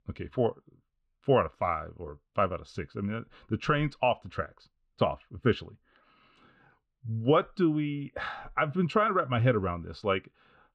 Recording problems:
muffled; very; fading above 3.5 kHz

